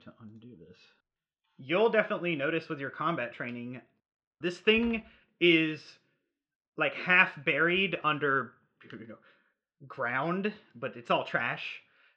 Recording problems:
muffled; very; fading above 4 kHz

